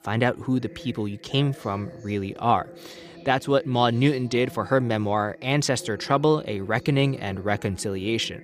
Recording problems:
voice in the background; noticeable; throughout; 20 dB below the speech

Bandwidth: 15 kHz